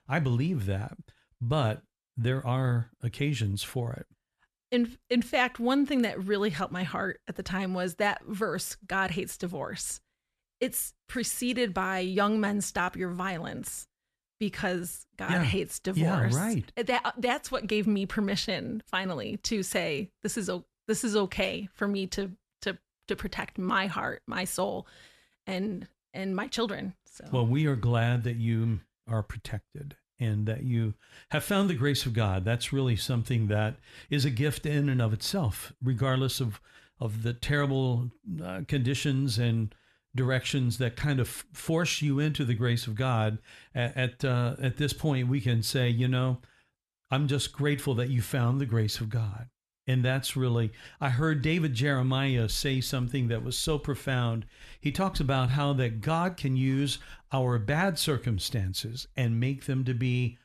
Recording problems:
none

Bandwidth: 13.5 kHz